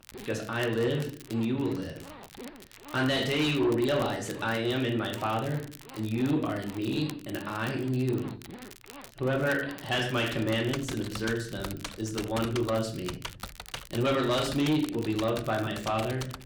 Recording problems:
distortion; slight; 10 dB below the speech
room echo; very slight; dies away in 0.4 s
off-mic speech; somewhat distant
household noises; noticeable; throughout; 15 dB below the speech
crackle, like an old record; noticeable; 20 dB below the speech

